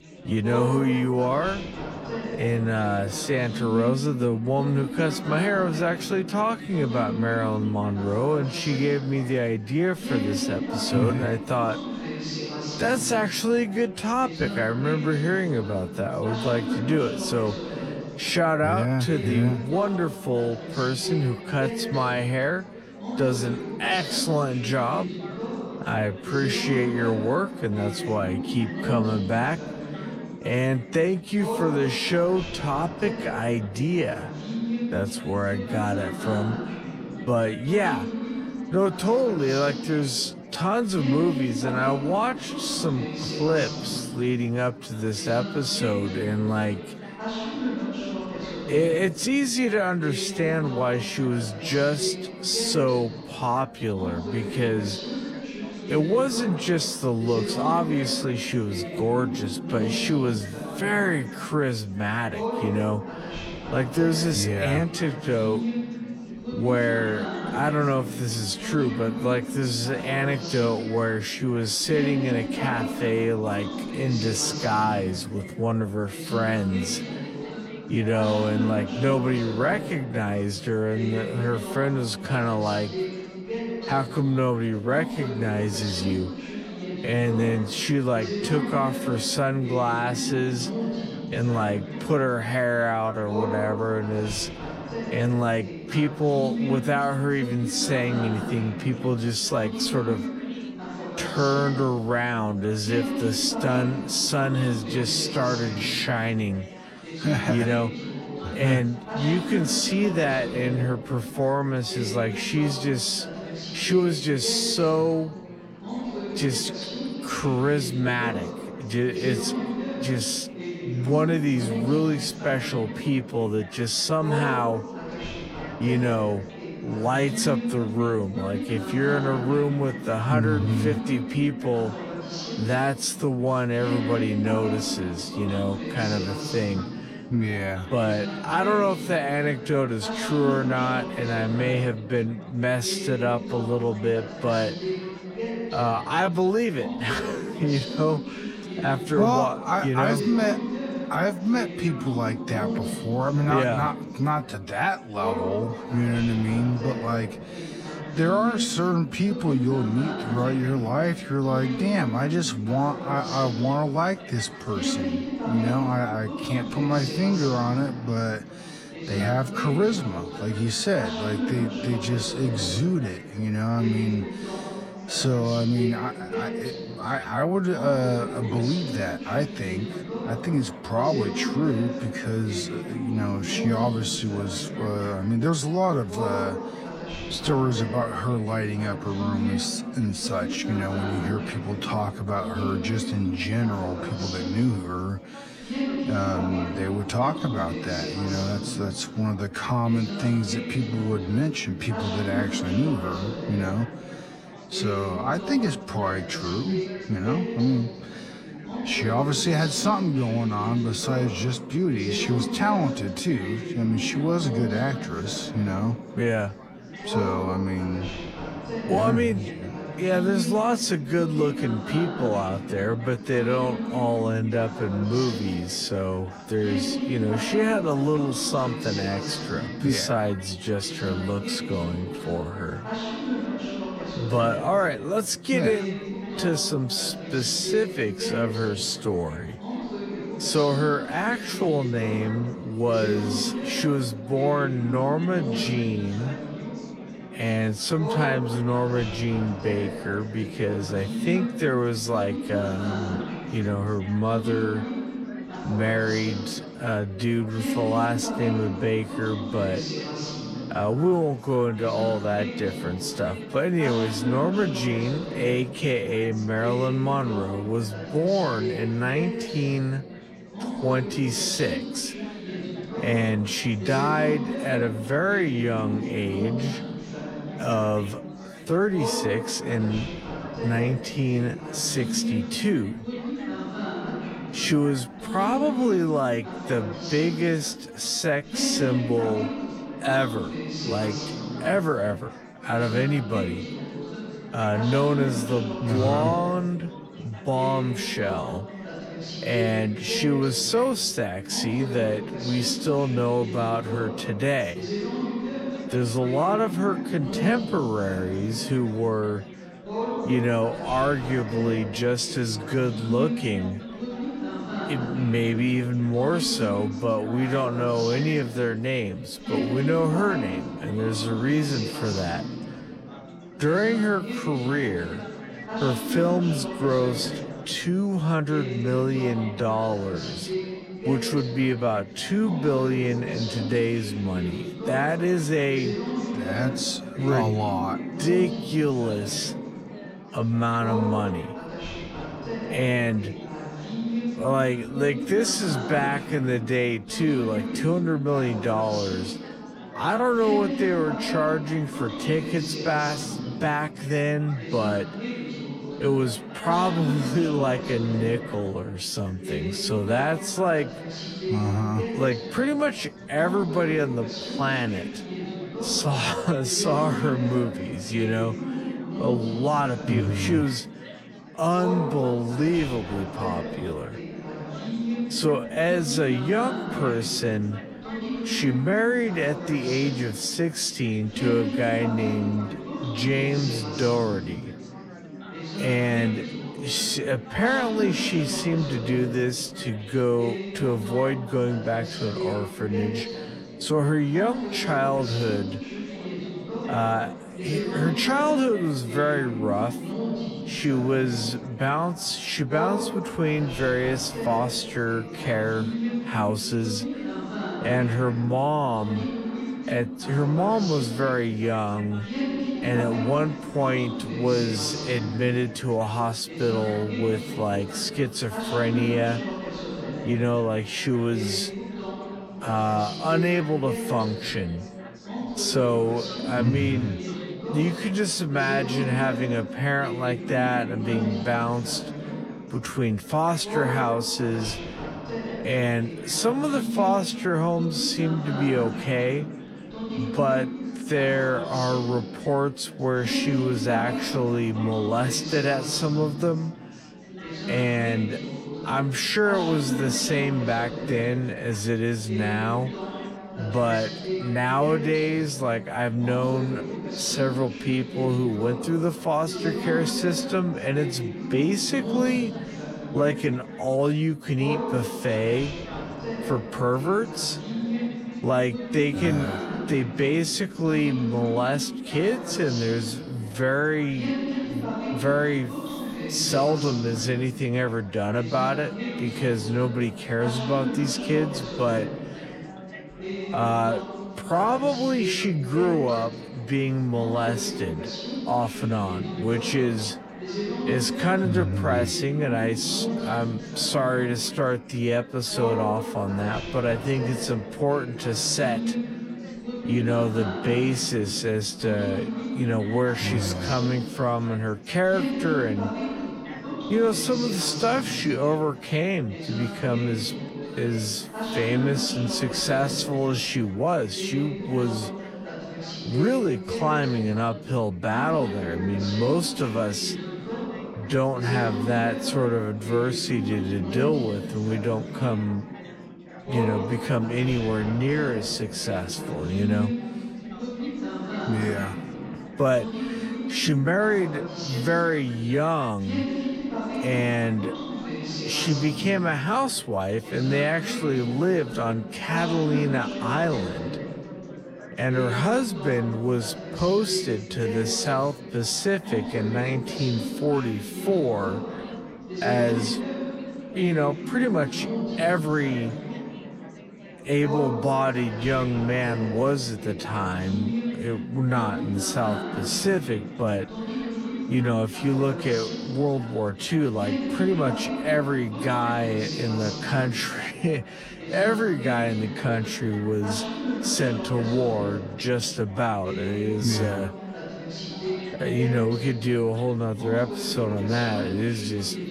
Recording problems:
wrong speed, natural pitch; too slow; 0.6 times normal speed
chatter from many people; loud; throughout; 7 dB below the speech

